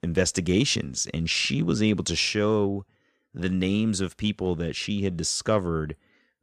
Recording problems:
none

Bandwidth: 14.5 kHz